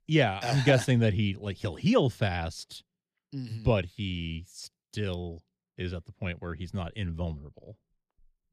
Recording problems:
none

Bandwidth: 14.5 kHz